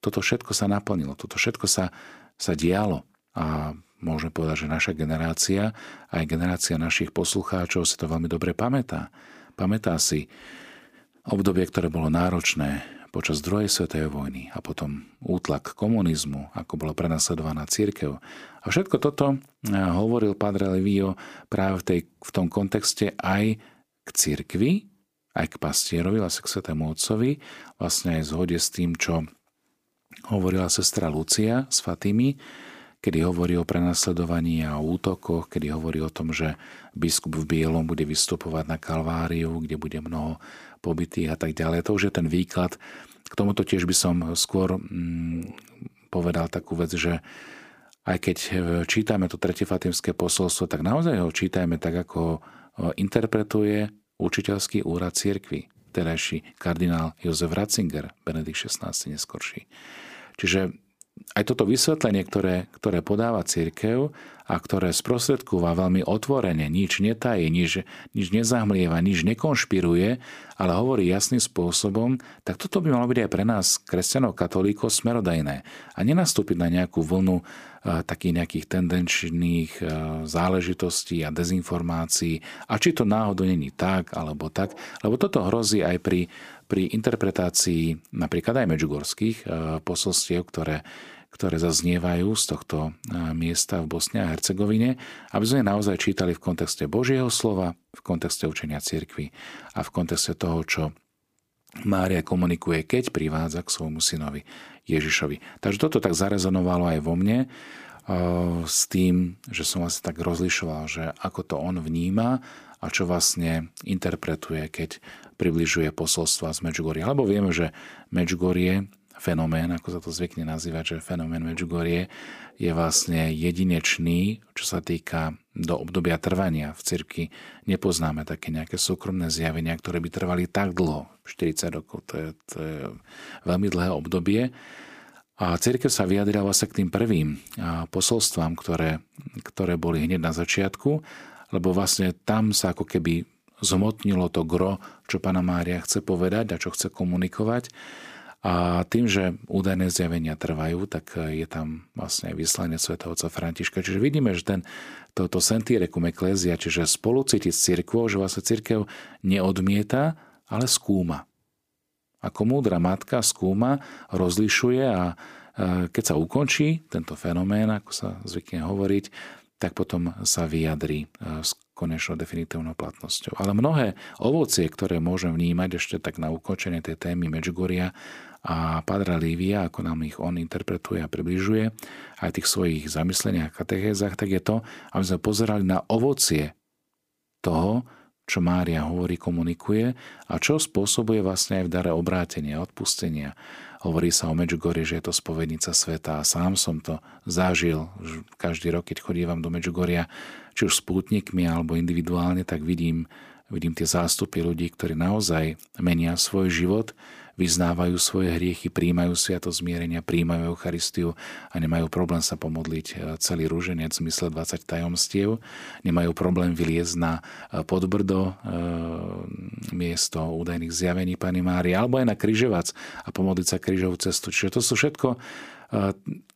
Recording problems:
none

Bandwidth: 15 kHz